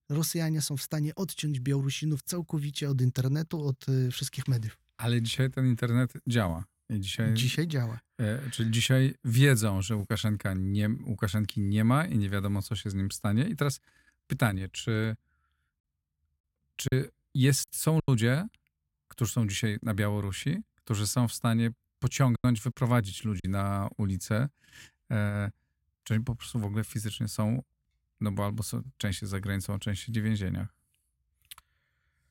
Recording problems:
choppy; very; from 17 to 18 s and from 22 to 23 s; 6% of the speech affected

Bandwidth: 16.5 kHz